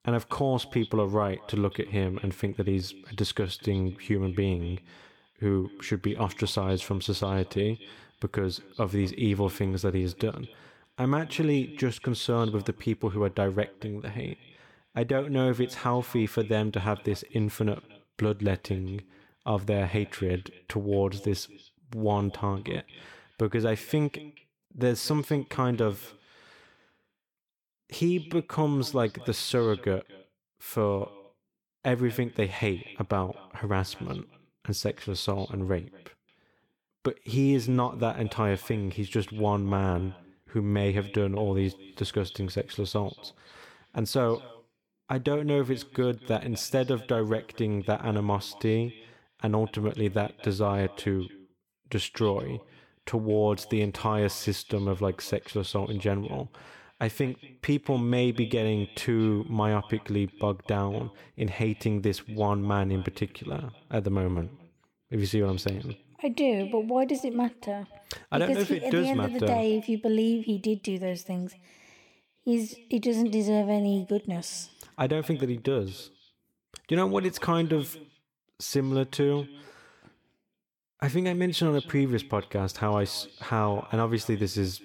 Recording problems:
echo of what is said; faint; throughout; 230 ms later, 20 dB below the speech

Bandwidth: 18 kHz